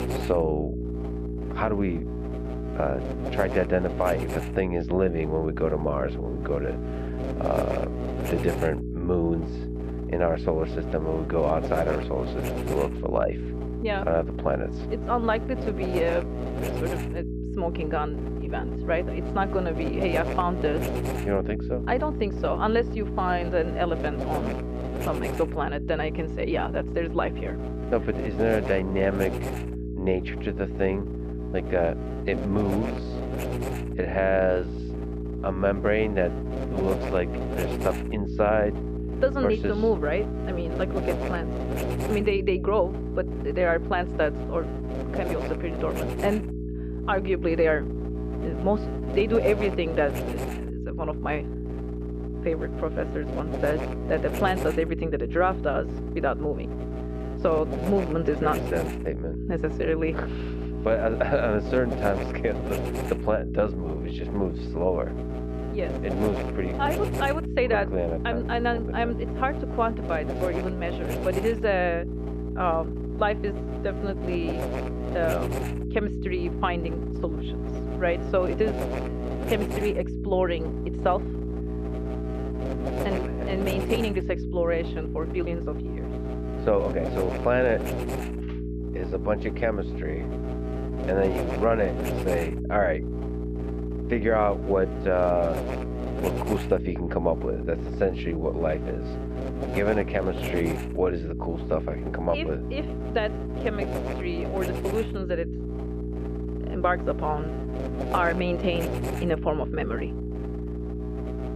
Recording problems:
muffled; very; fading above 3 kHz
electrical hum; loud; throughout; 60 Hz, 7 dB below the speech

